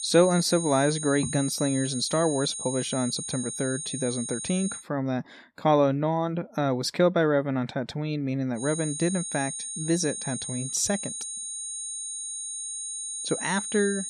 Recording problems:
high-pitched whine; loud; until 5 s and from 8.5 s on; 9 kHz, 5 dB below the speech

